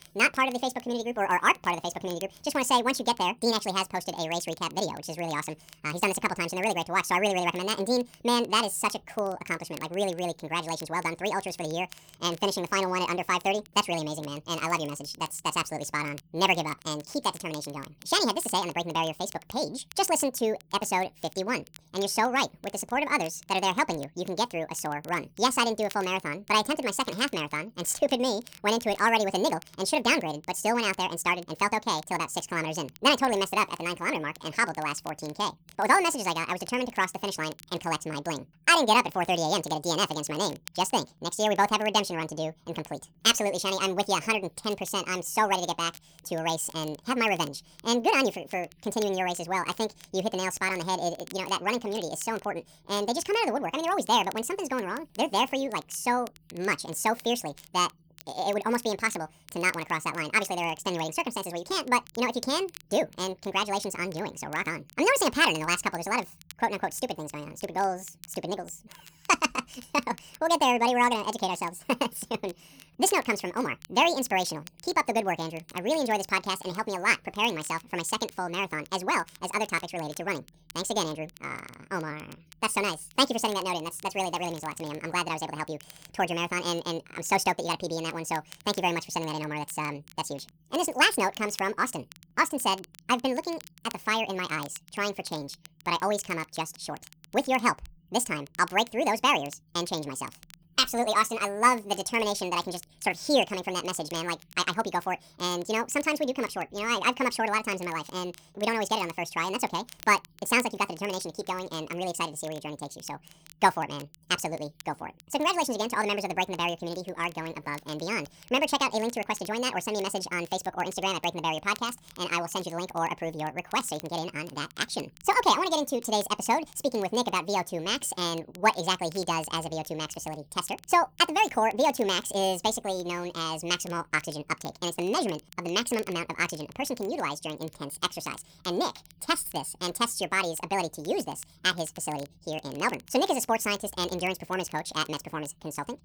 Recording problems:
wrong speed and pitch; too fast and too high; 1.7 times normal speed
crackle, like an old record; faint; 25 dB below the speech

